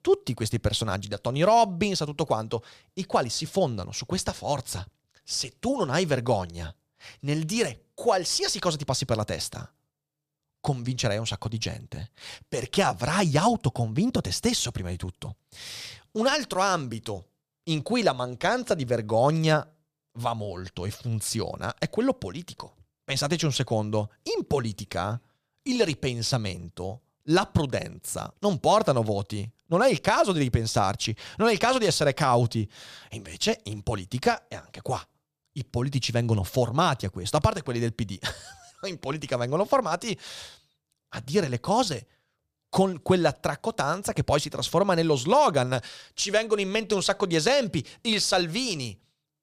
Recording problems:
none

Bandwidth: 15 kHz